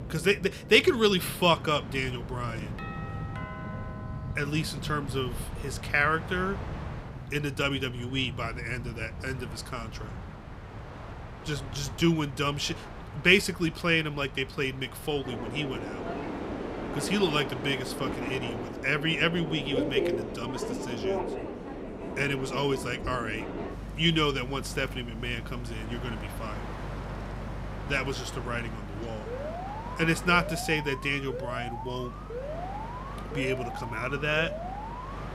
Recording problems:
train or aircraft noise; loud; throughout; 9 dB below the speech
doorbell; faint; from 3 to 5 s; peak 10 dB below the speech
alarm; noticeable; from 29 s on; peak 8 dB below the speech

